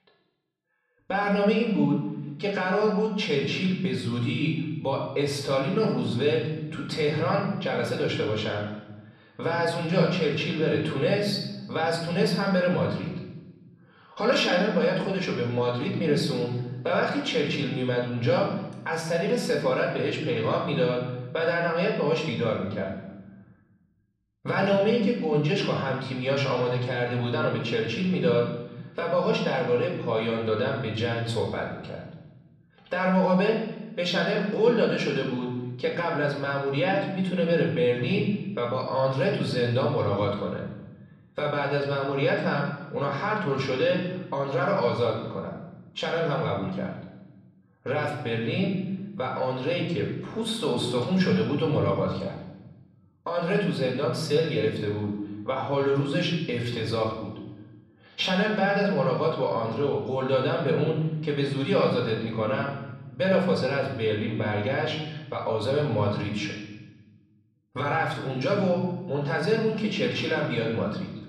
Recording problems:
off-mic speech; far
room echo; noticeable; dies away in 1 s

